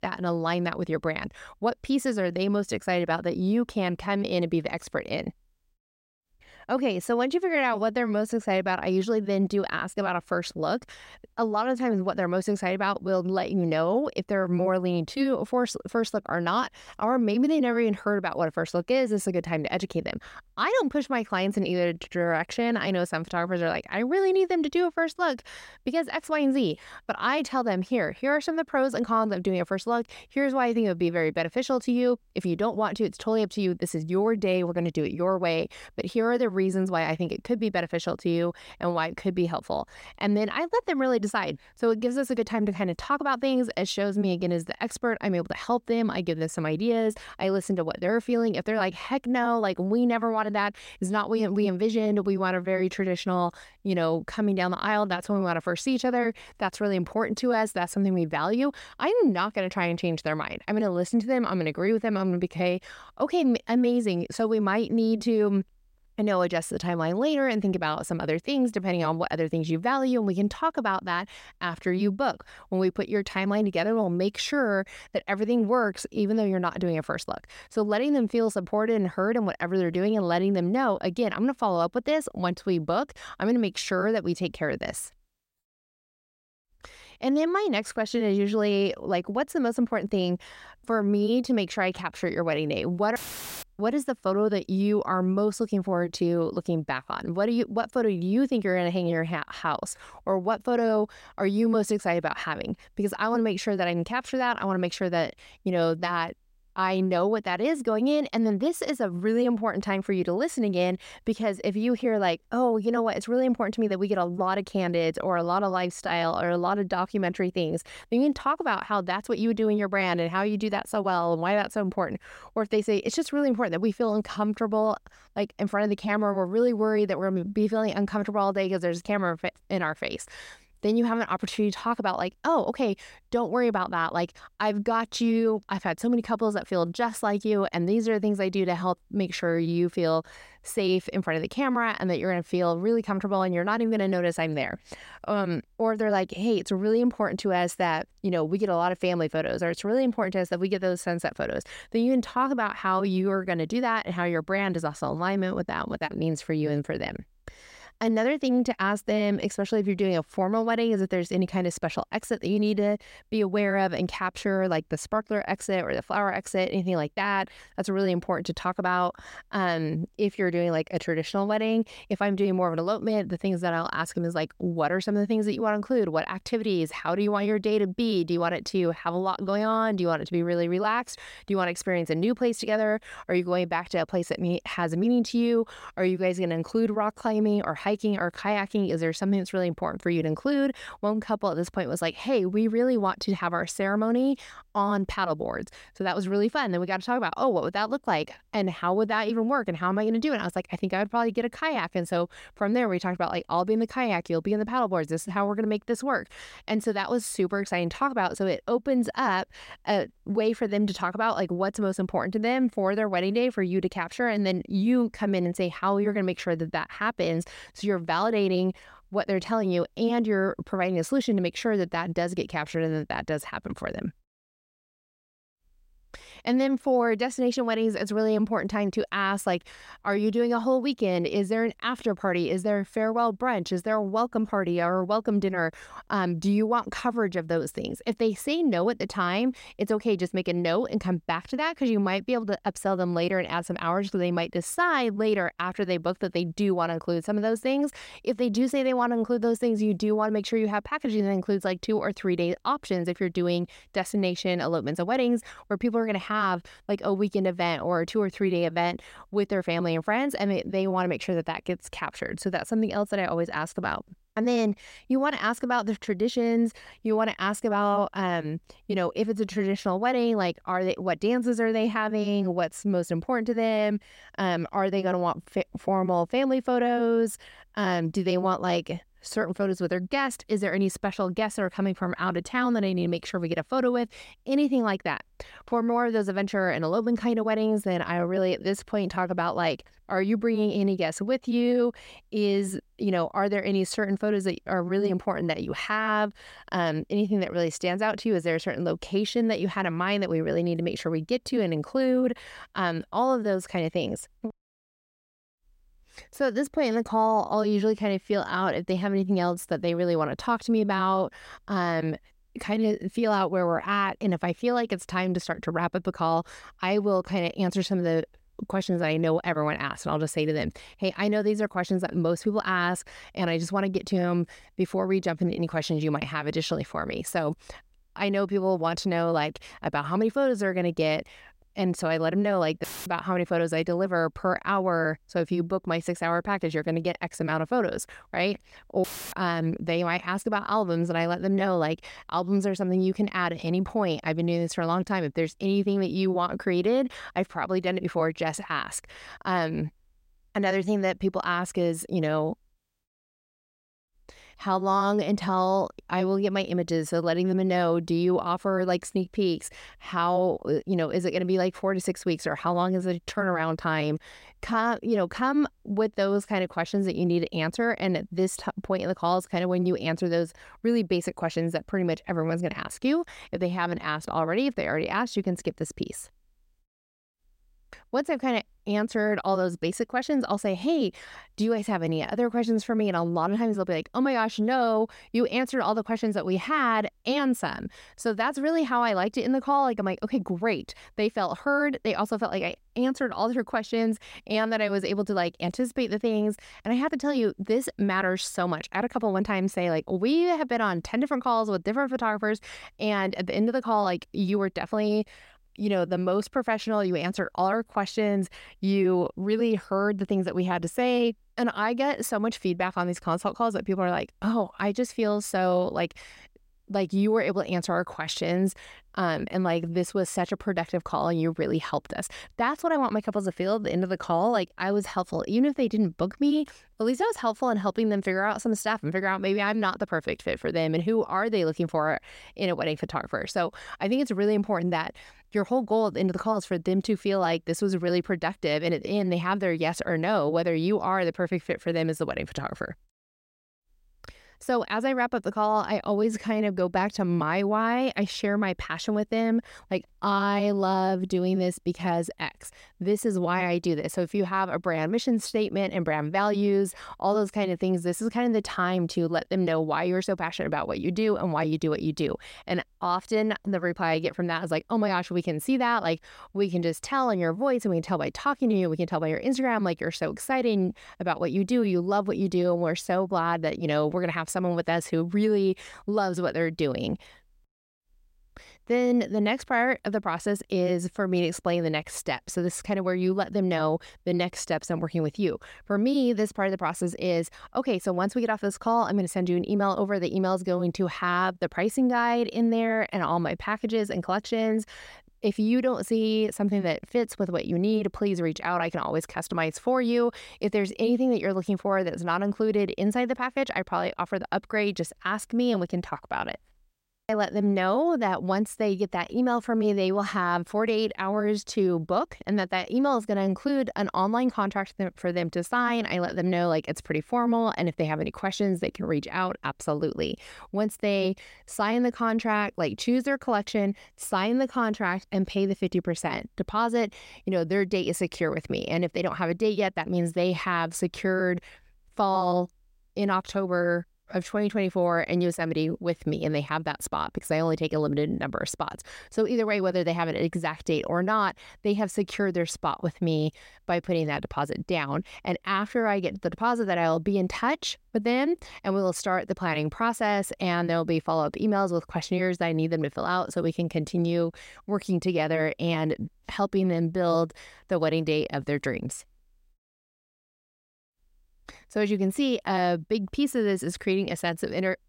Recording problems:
audio cutting out; filled with static; at 1:33, at 5:33 and at 5:39

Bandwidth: 16 kHz